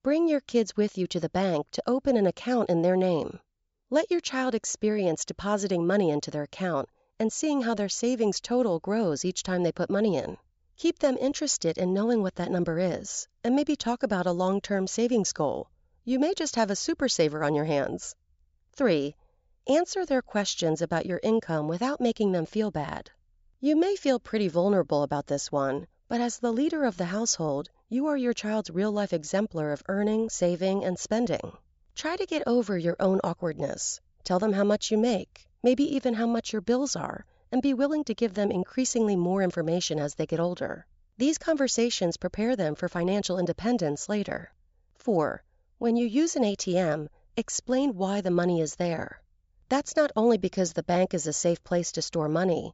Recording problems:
high frequencies cut off; noticeable; nothing above 8 kHz

